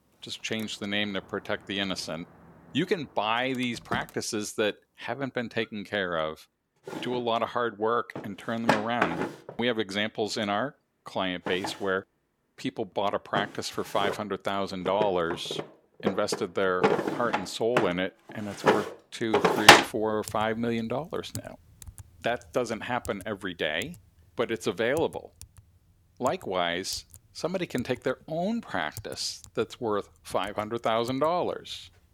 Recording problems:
household noises; very loud; throughout; 4 dB above the speech

